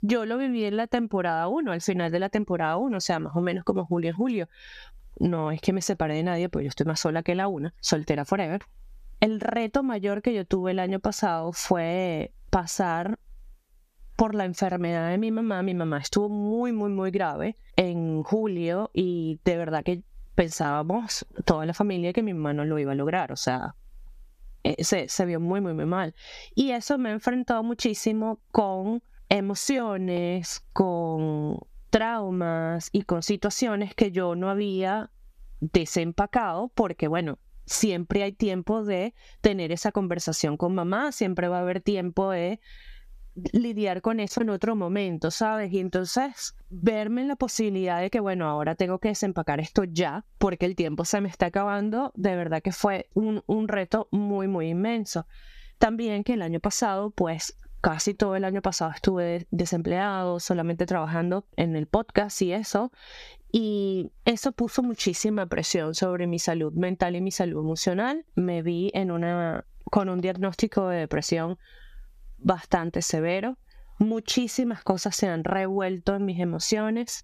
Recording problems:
squashed, flat; somewhat

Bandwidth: 14.5 kHz